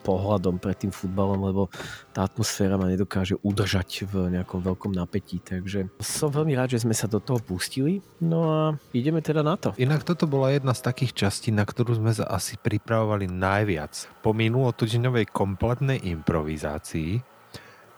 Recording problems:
traffic noise; faint; throughout; 25 dB below the speech

